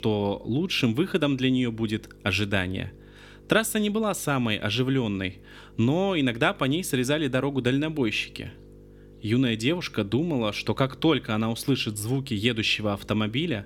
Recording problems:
electrical hum; faint; throughout; 50 Hz, 30 dB below the speech

